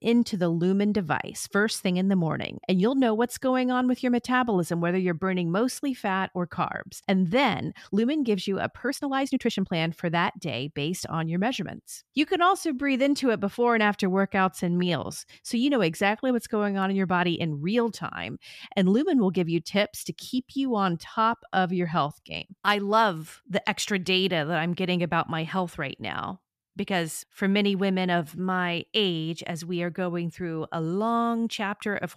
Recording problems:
uneven, jittery; strongly; from 8 to 29 s

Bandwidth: 14.5 kHz